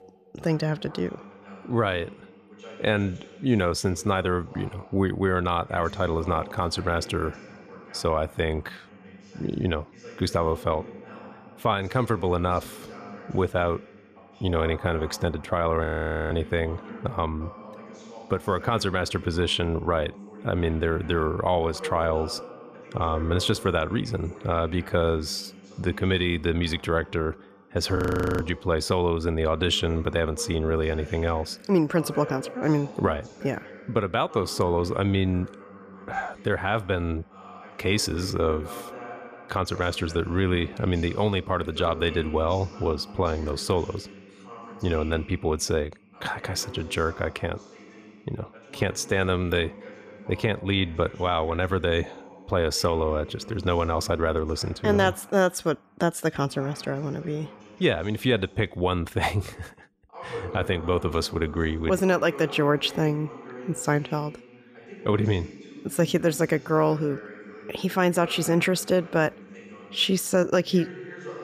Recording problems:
voice in the background; noticeable; throughout; 15 dB below the speech
audio freezing; at 16 s and at 28 s

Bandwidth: 14.5 kHz